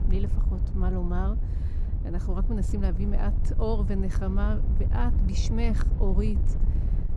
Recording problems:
wind noise on the microphone; heavy; 8 dB below the speech

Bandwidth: 15 kHz